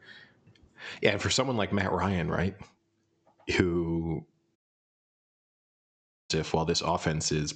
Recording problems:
high frequencies cut off; noticeable; nothing above 8 kHz
squashed, flat; somewhat
audio cutting out; at 4.5 s for 1.5 s

